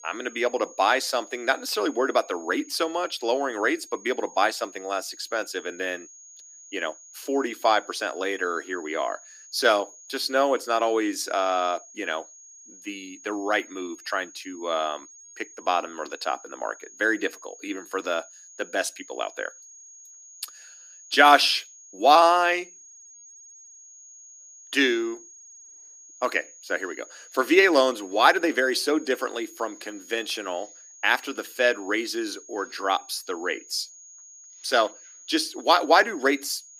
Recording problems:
thin; very slightly; fading below 300 Hz
high-pitched whine; faint; throughout; 6.5 kHz, 20 dB below the speech

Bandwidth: 15 kHz